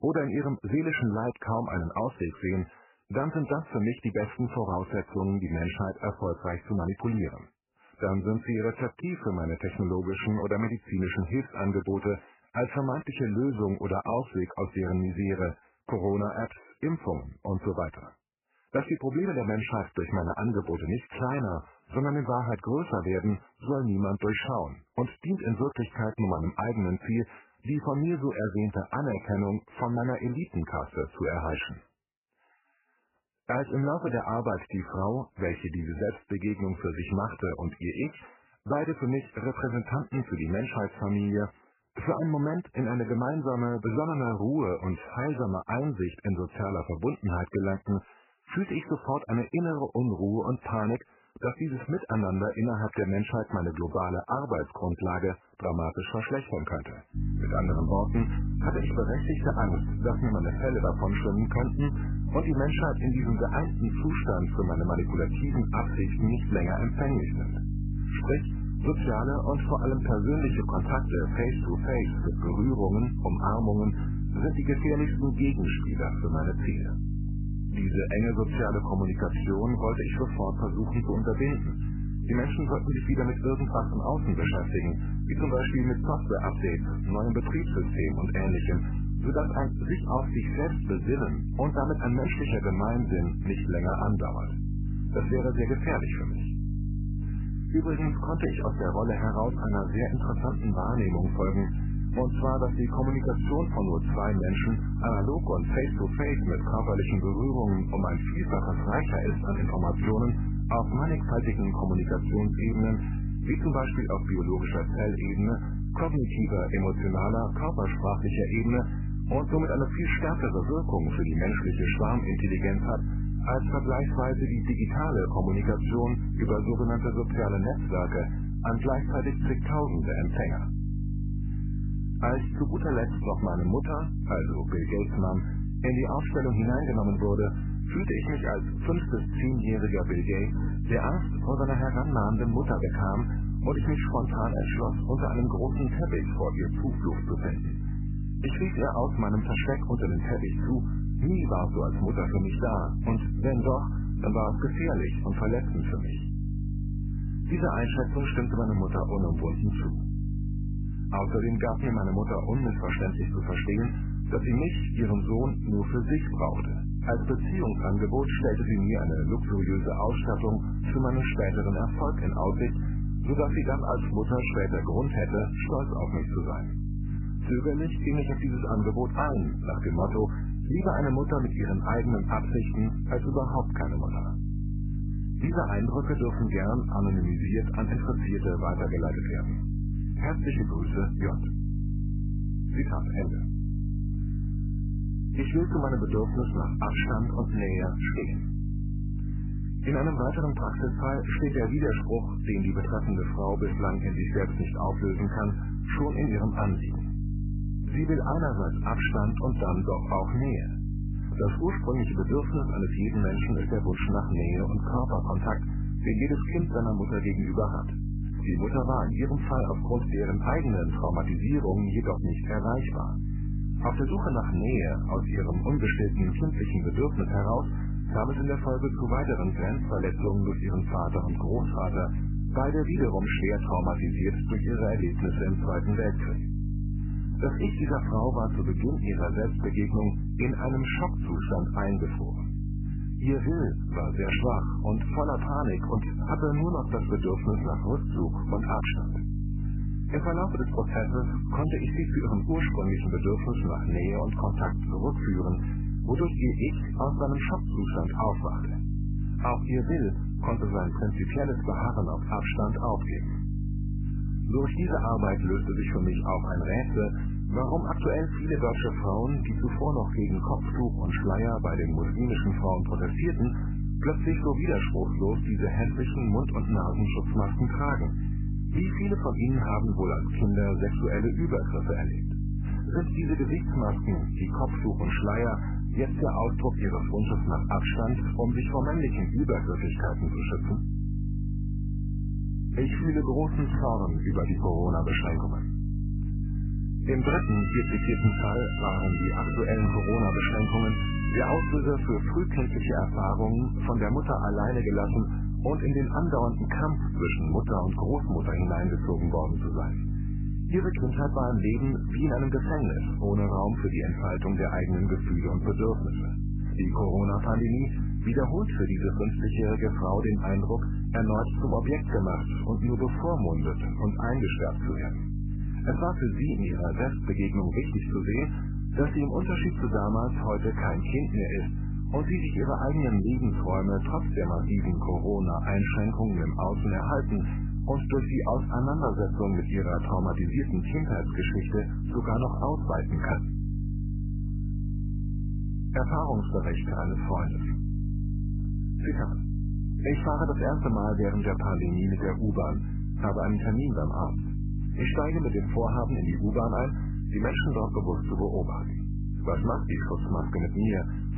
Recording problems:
garbled, watery; badly; nothing above 3 kHz
electrical hum; loud; from 57 s on; 50 Hz, 10 dB below the speech
siren; noticeable; from 4:57 to 5:02; peak 5 dB below the speech

